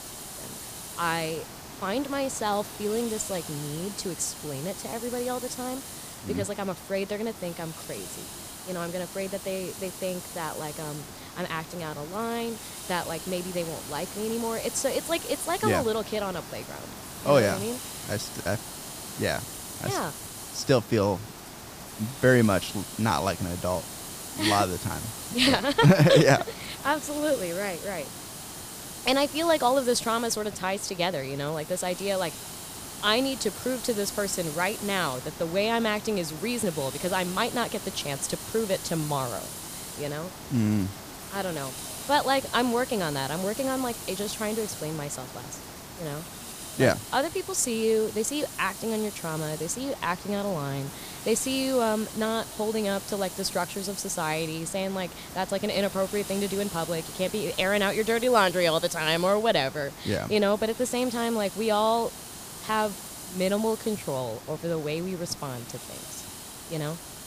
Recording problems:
hiss; noticeable; throughout; 10 dB below the speech

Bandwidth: 15 kHz